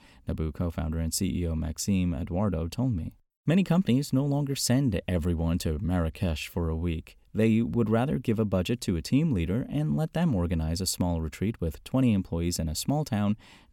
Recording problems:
none

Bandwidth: 17.5 kHz